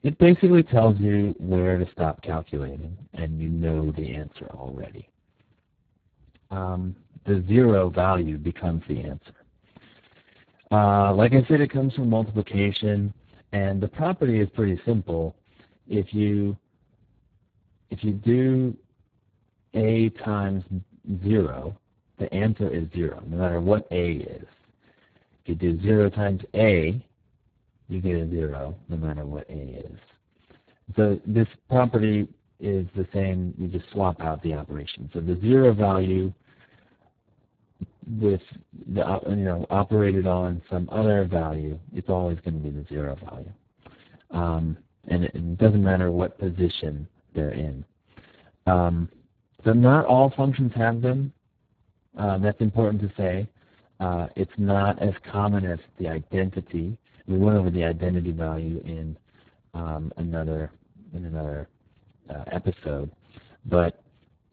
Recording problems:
garbled, watery; badly; nothing above 4 kHz
uneven, jittery; slightly; from 35 s to 1:01

